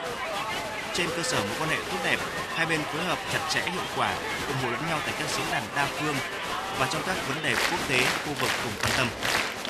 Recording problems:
crowd noise; very loud; throughout; 1 dB above the speech

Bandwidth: 13.5 kHz